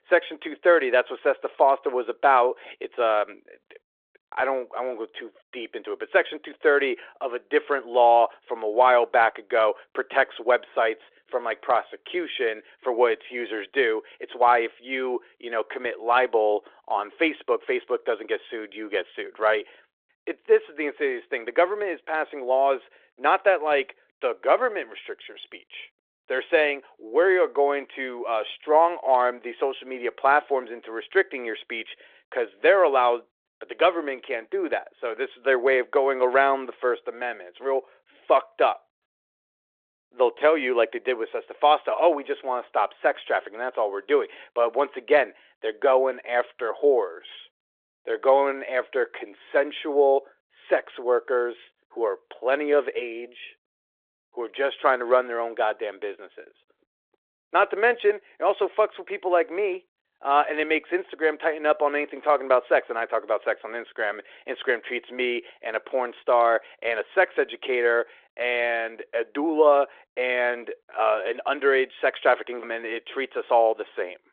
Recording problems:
phone-call audio; nothing above 3.5 kHz

